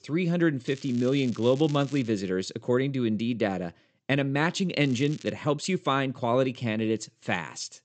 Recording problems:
high frequencies cut off; noticeable; nothing above 8 kHz
crackling; faint; from 0.5 to 2 s and at 5 s; 20 dB below the speech

